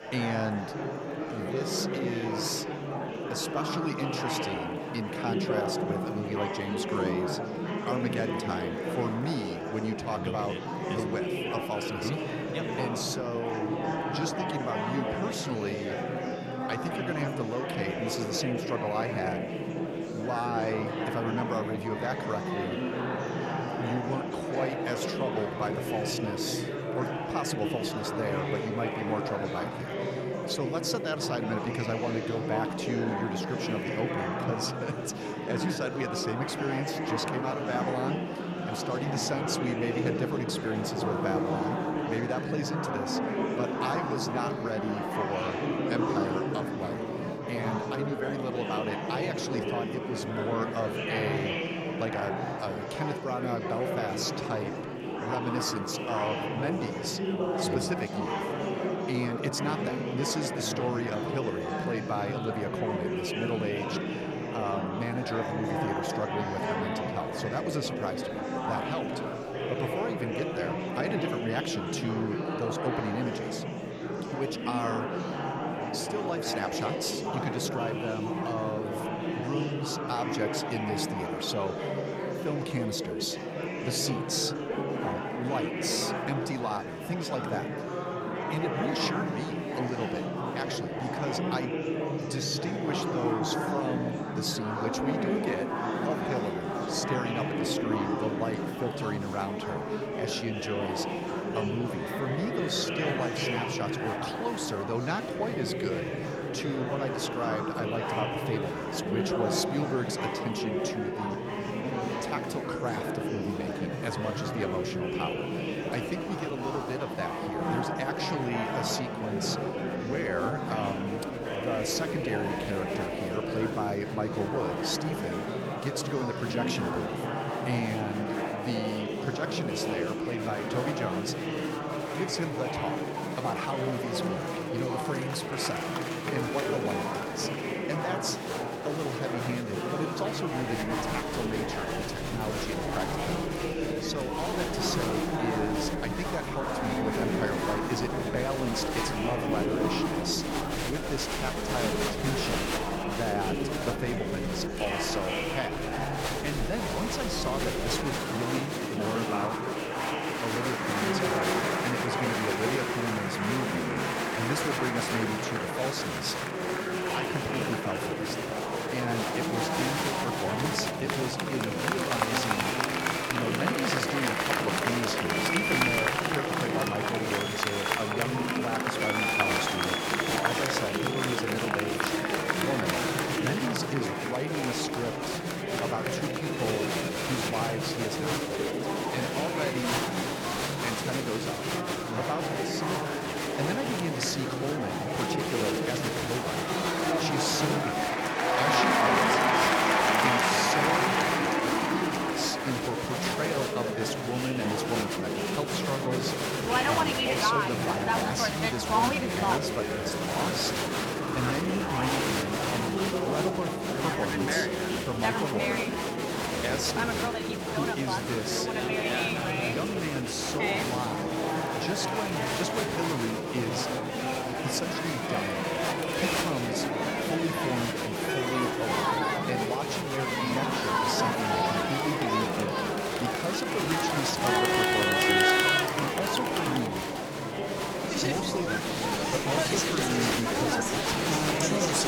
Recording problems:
murmuring crowd; very loud; throughout; 4 dB above the speech

